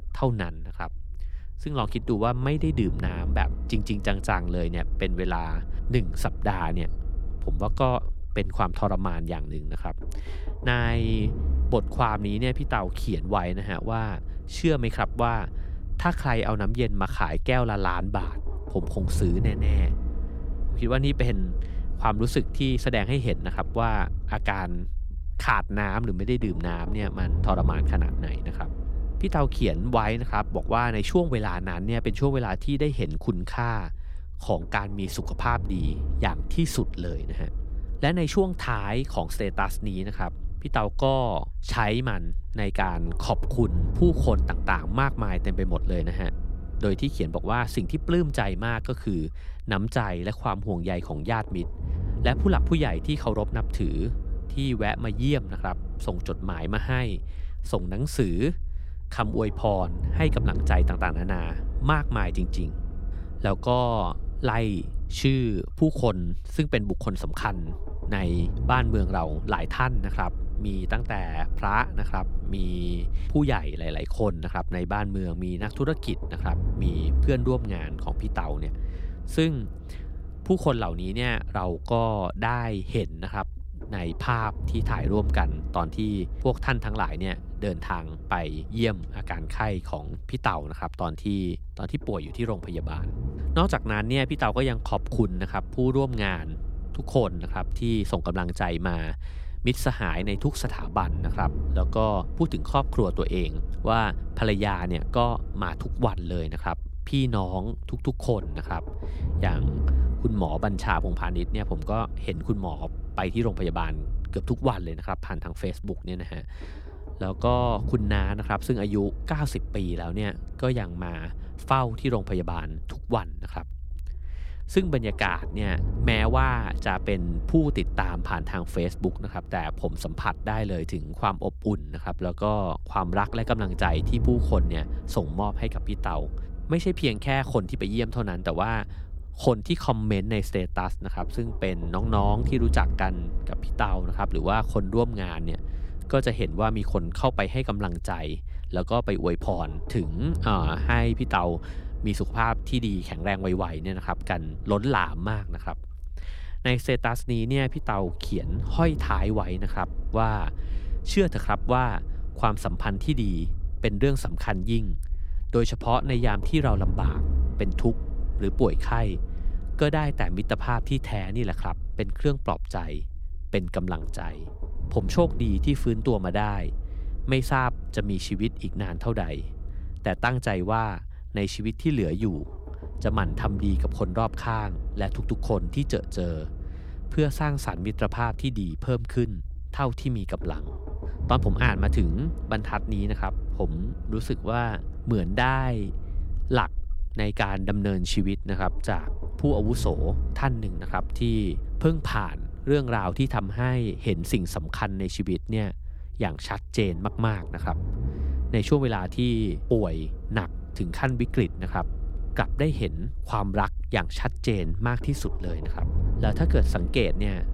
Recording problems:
low rumble; noticeable; throughout; 20 dB below the speech

